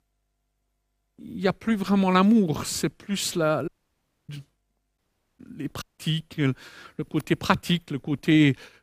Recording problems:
audio cutting out; at 3.5 s for 0.5 s, at 5 s and at 6 s

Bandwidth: 15 kHz